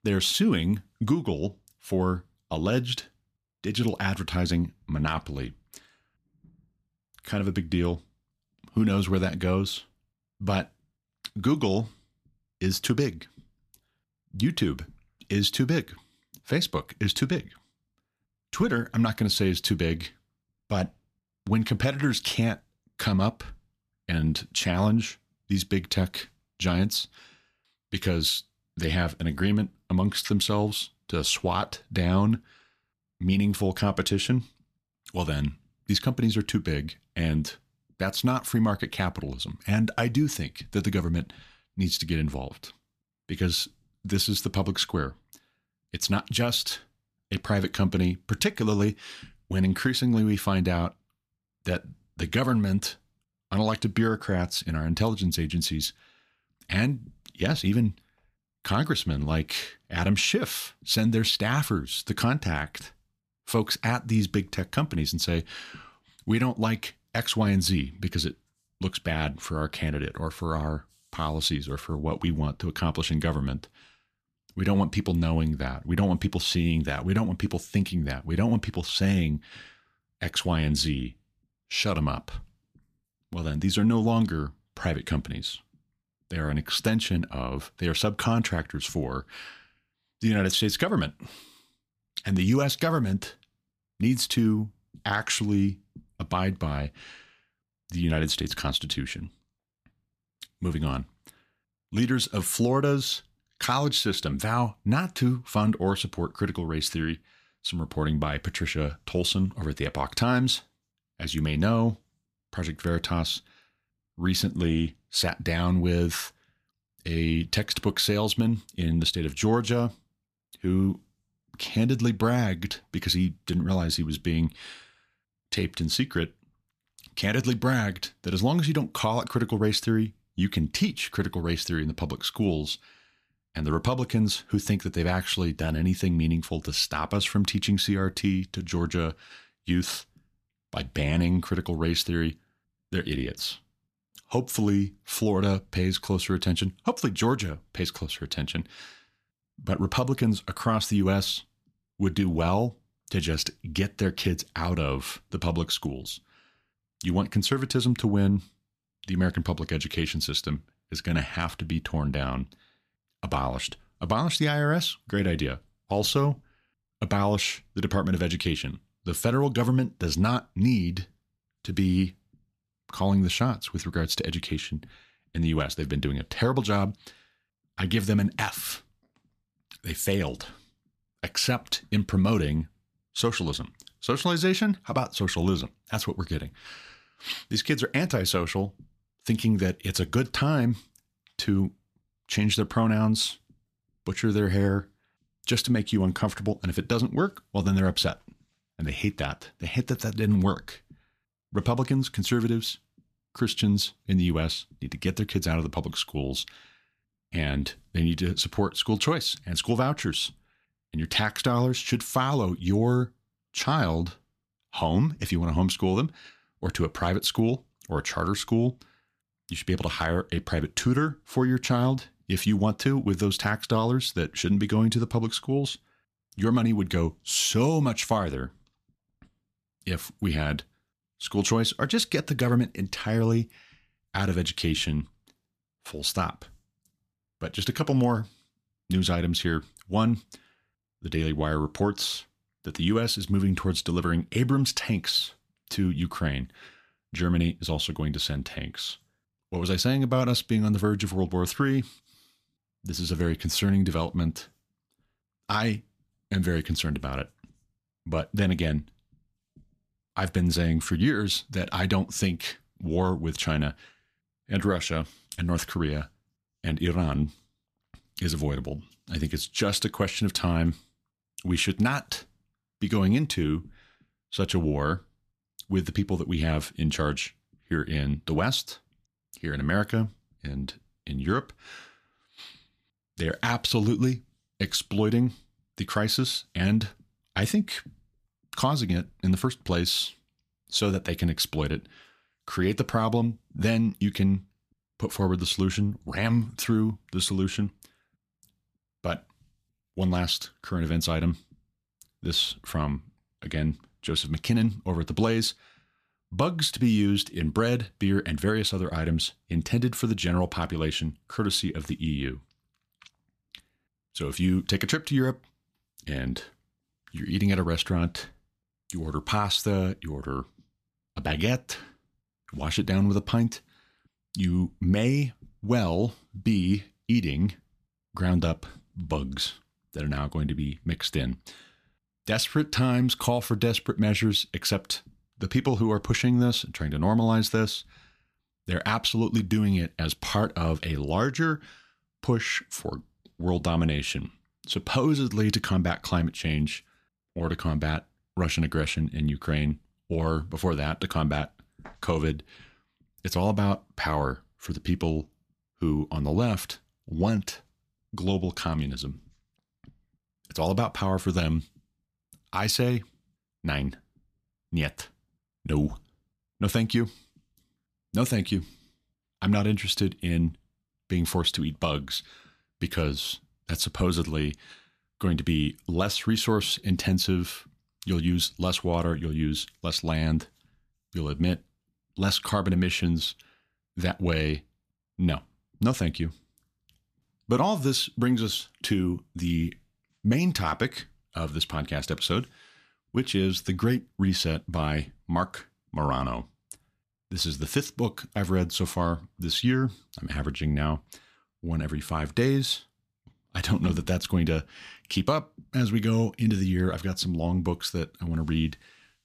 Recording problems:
none

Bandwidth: 14.5 kHz